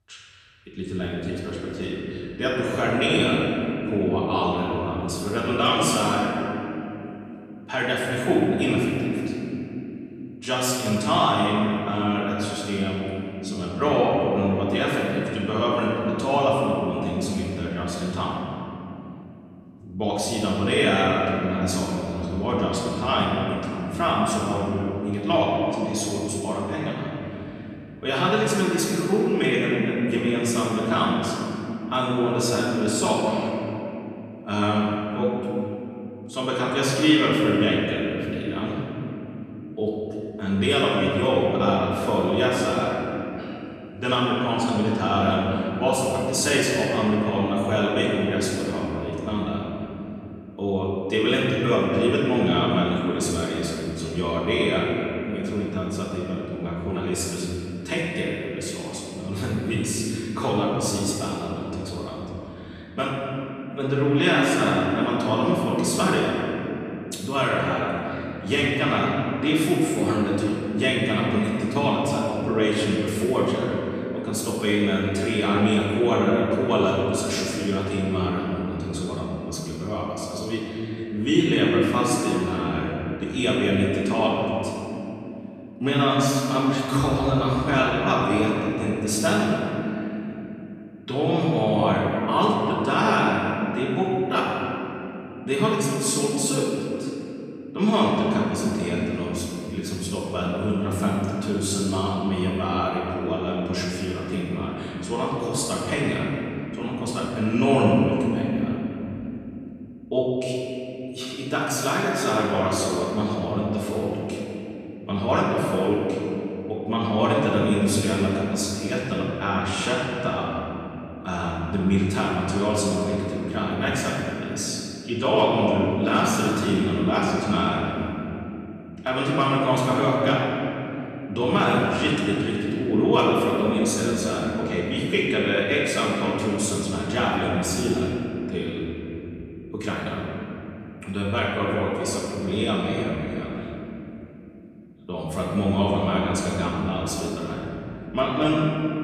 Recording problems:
room echo; strong; dies away in 3 s
off-mic speech; far

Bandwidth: 14.5 kHz